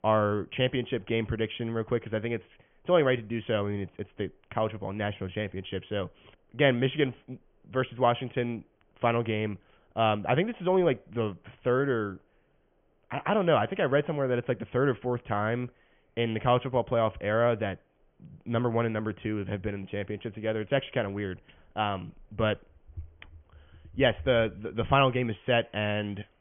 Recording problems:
high frequencies cut off; severe; nothing above 3.5 kHz

